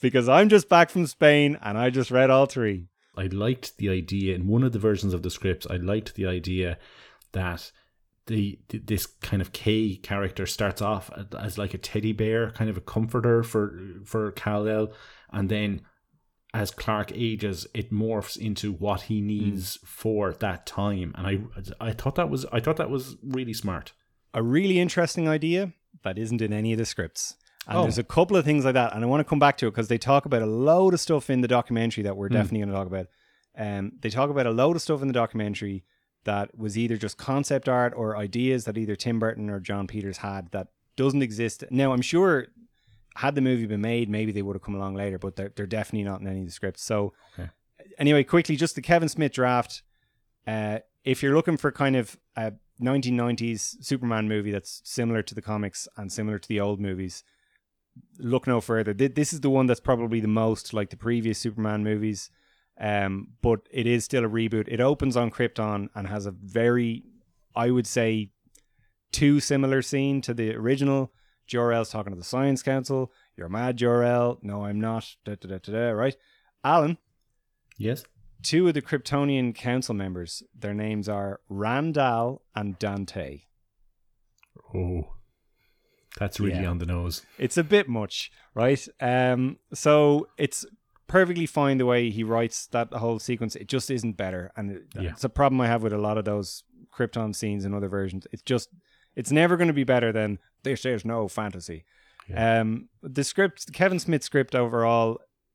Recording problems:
none

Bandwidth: 18 kHz